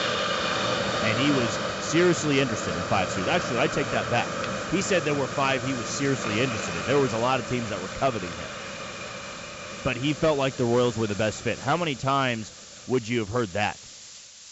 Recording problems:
high frequencies cut off; noticeable; nothing above 7.5 kHz
hiss; loud; throughout; 4 dB below the speech

